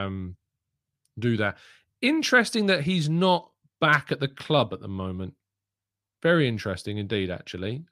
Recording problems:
abrupt cut into speech; at the start

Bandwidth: 15 kHz